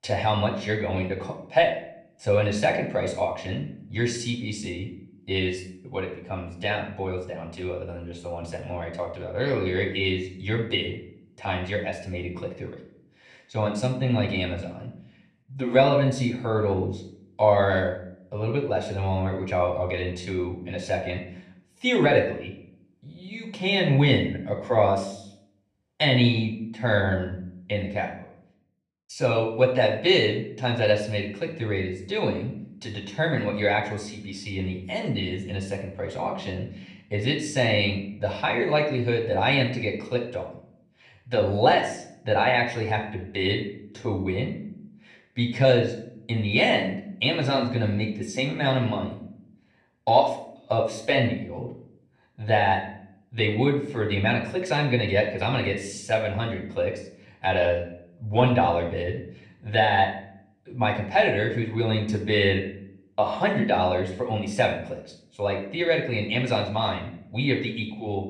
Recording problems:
off-mic speech; far
room echo; slight; dies away in 0.5 s

